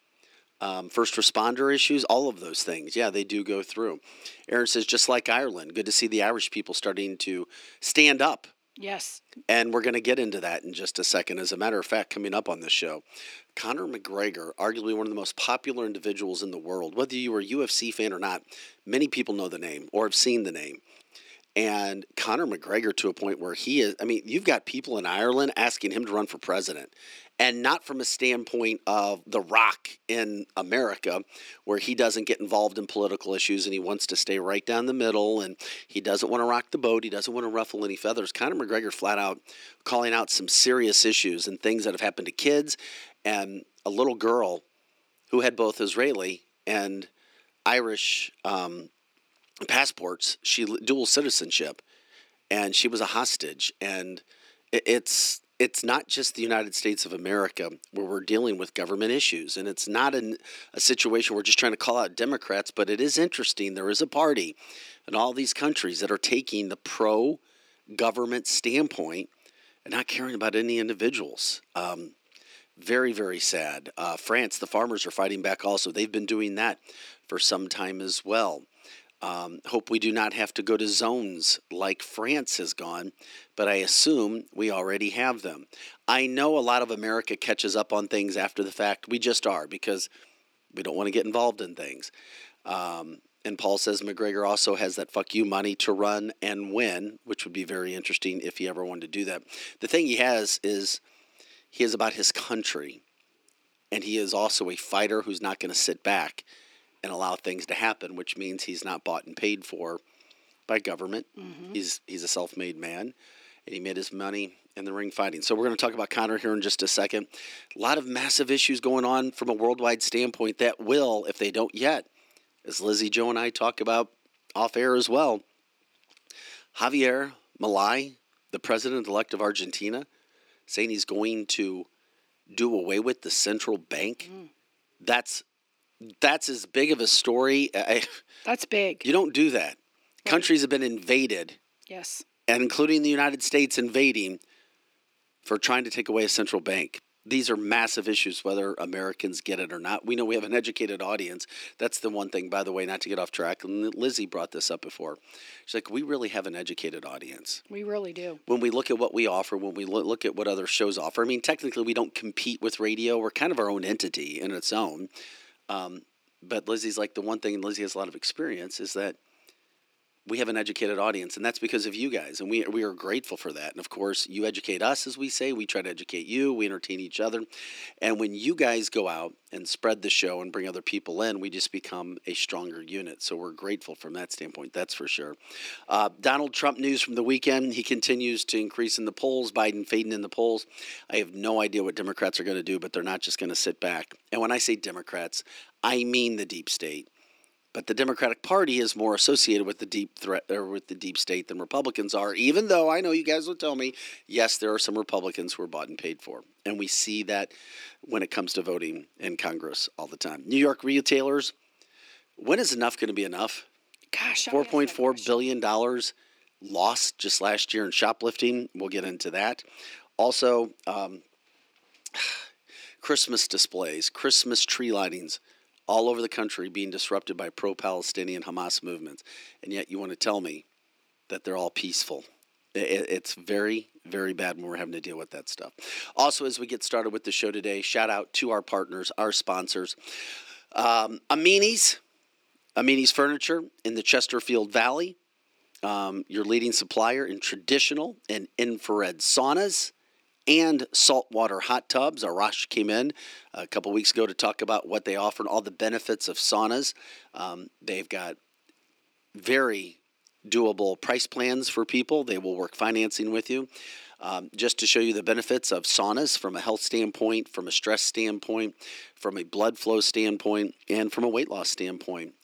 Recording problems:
thin; very slightly; fading below 300 Hz

